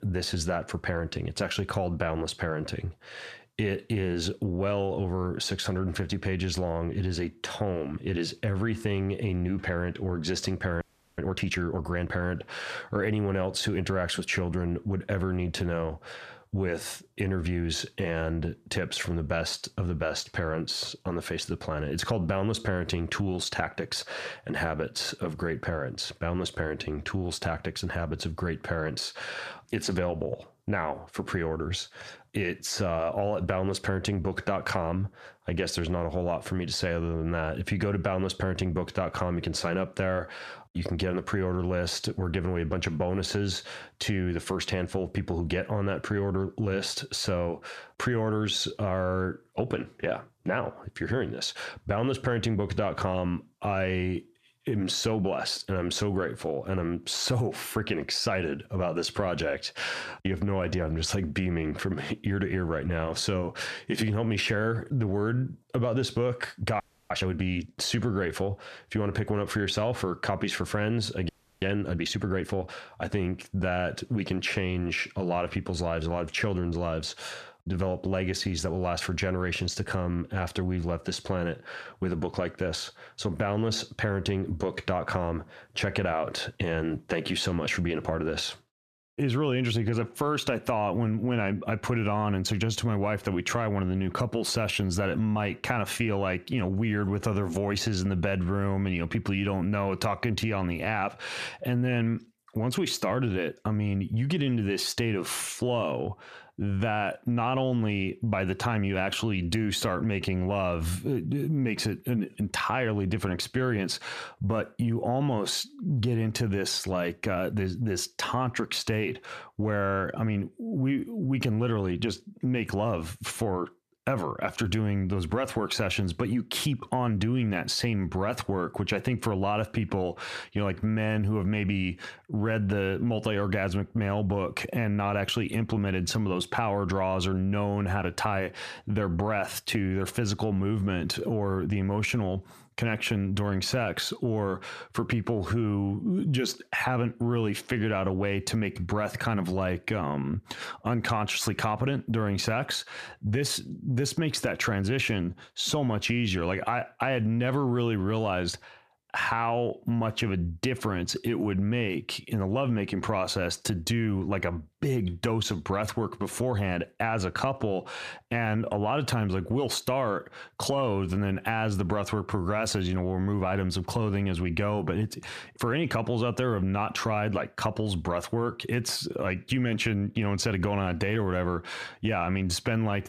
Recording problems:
squashed, flat; heavily
audio freezing; at 11 s, at 1:07 and at 1:11

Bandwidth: 14.5 kHz